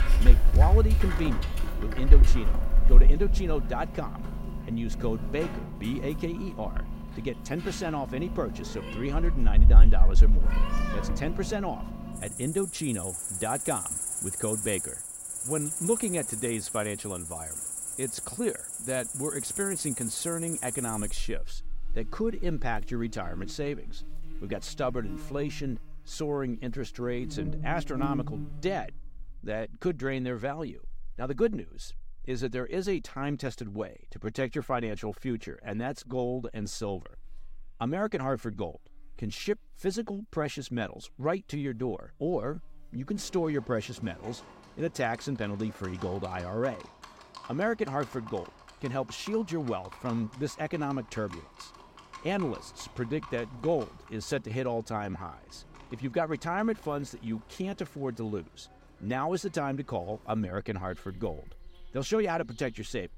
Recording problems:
animal sounds; very loud; throughout; 4 dB above the speech

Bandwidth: 16 kHz